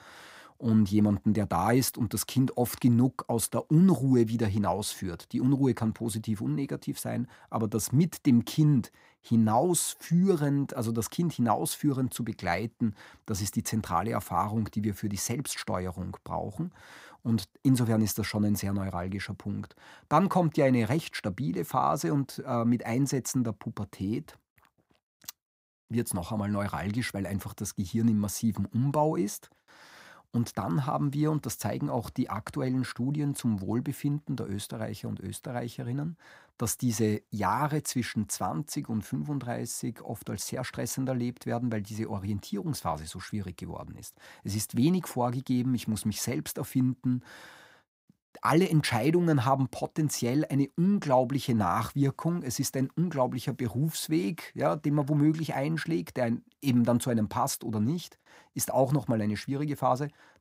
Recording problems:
none

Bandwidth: 15.5 kHz